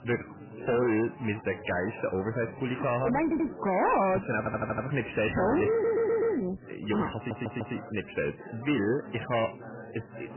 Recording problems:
distortion; heavy; 14% of the sound clipped
garbled, watery; badly; nothing above 3 kHz
chatter from many people; noticeable; throughout; 15 dB below the speech
audio stuttering; 4 times, first at 3 s

